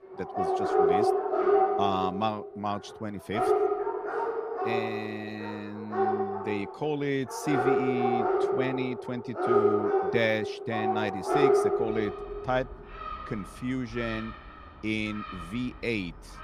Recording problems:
animal sounds; very loud; throughout; 5 dB above the speech

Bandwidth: 15 kHz